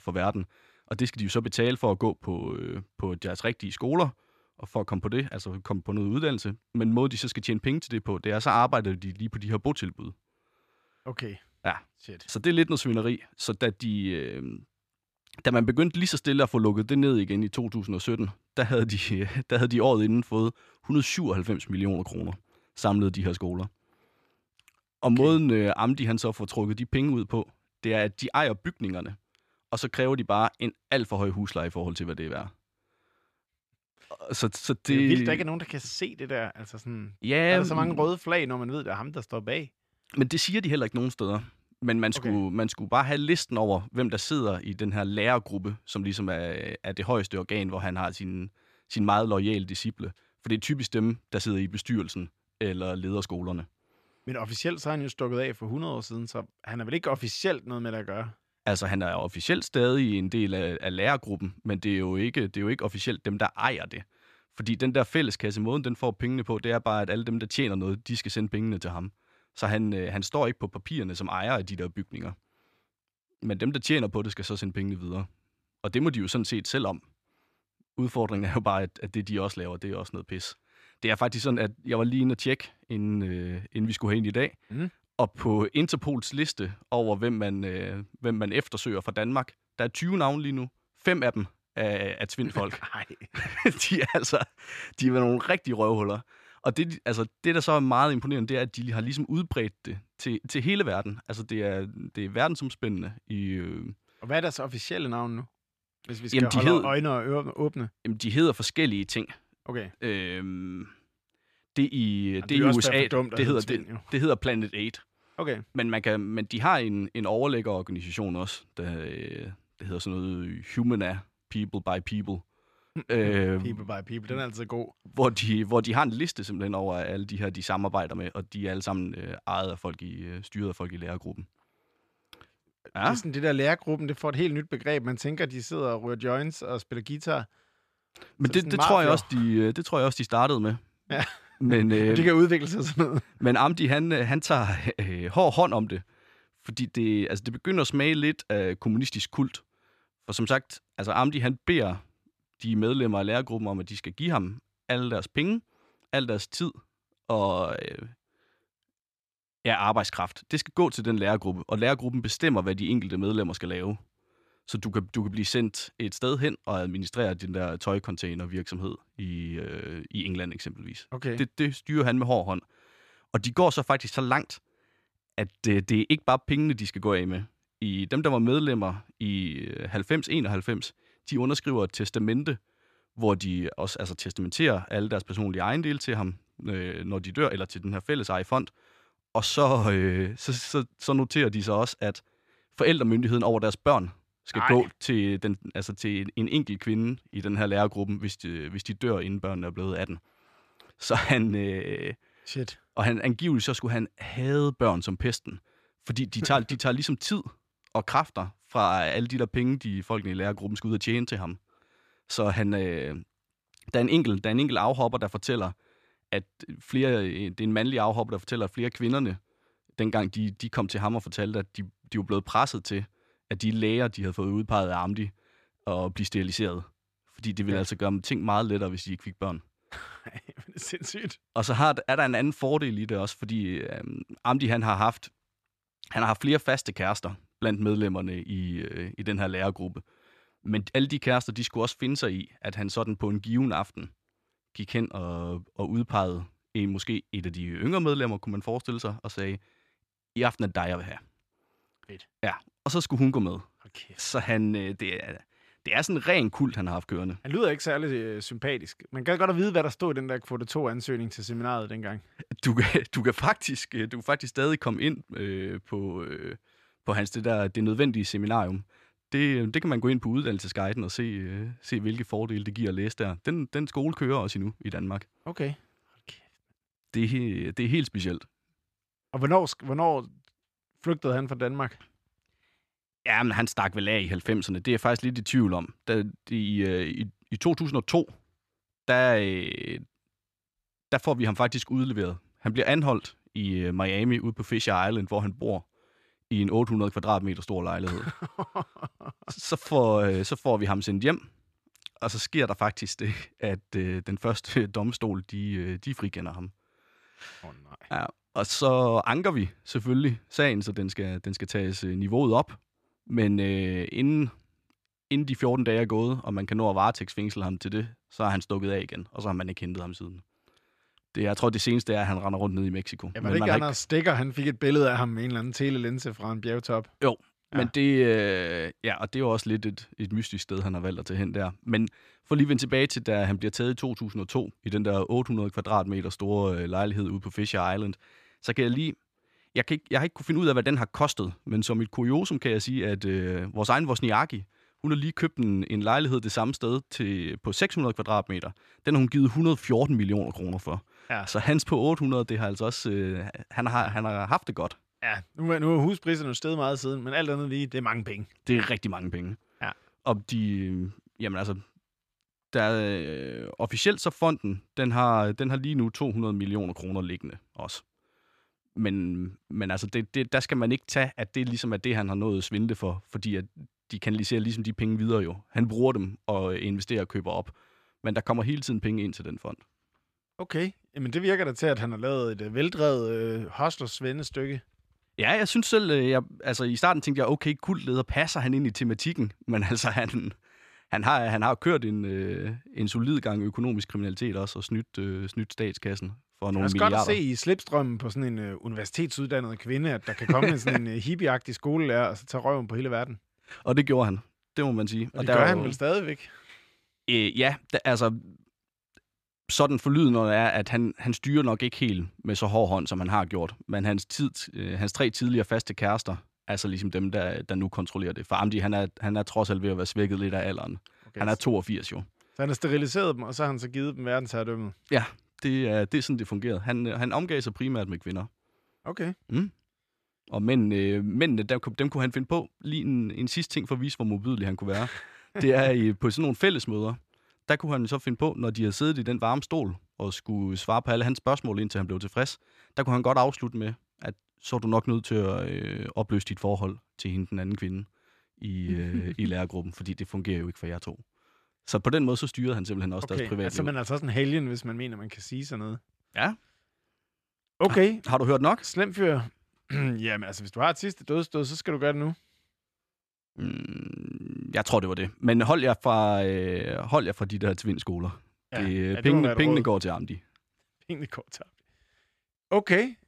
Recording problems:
none

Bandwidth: 14.5 kHz